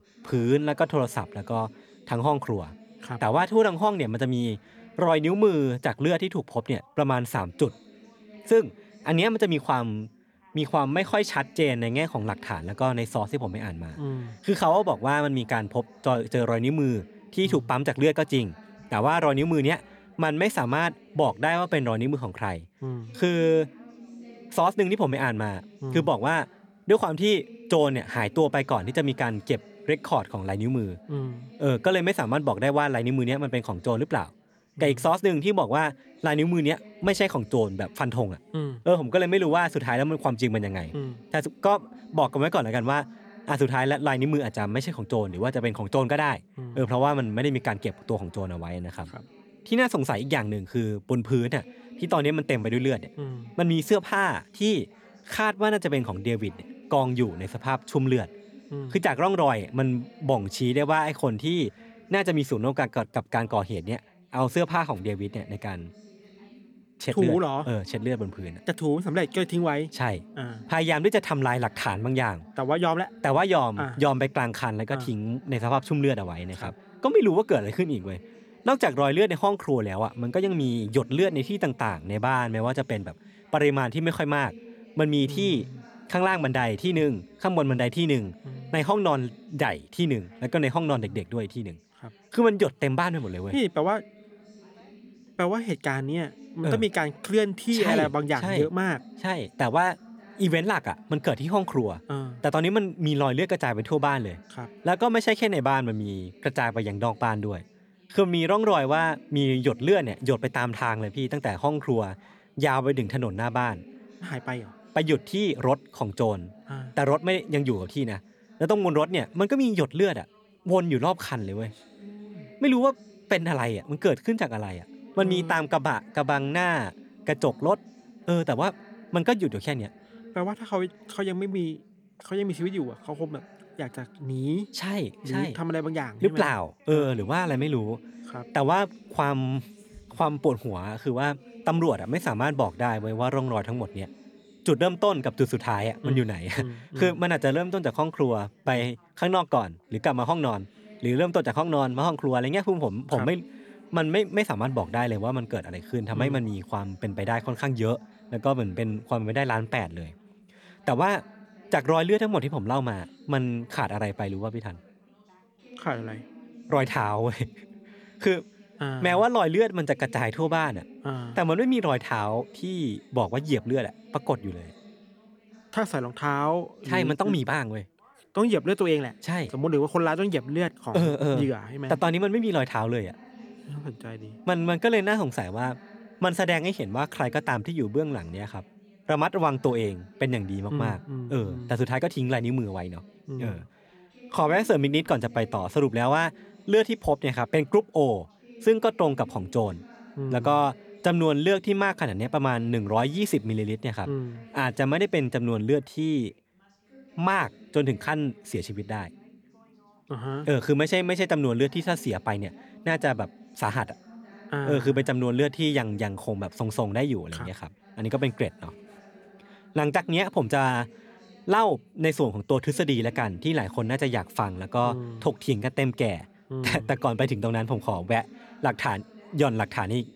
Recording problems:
background chatter; faint; throughout; 3 voices, 25 dB below the speech

